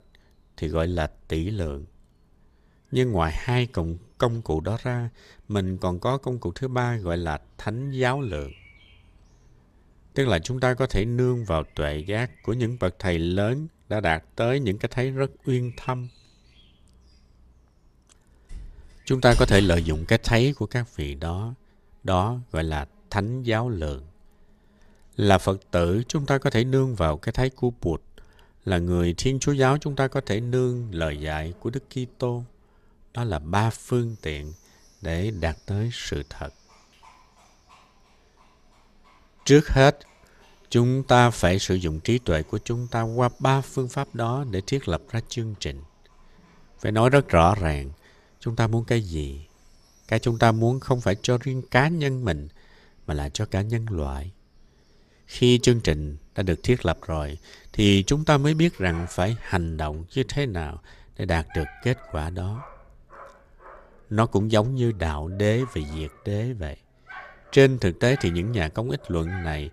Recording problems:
animal sounds; faint; throughout; 20 dB below the speech

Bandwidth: 14.5 kHz